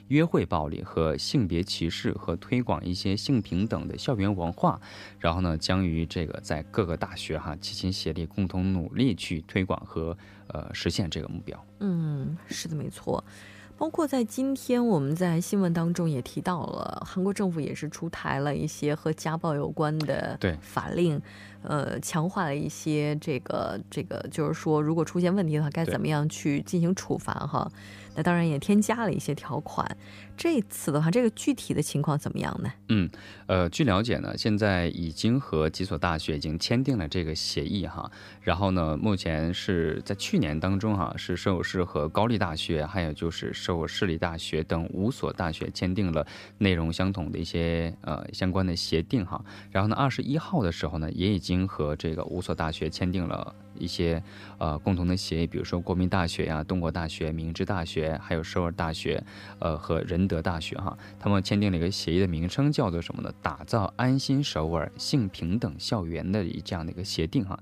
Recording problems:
electrical hum; faint; throughout; 50 Hz, 25 dB below the speech

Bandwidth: 15 kHz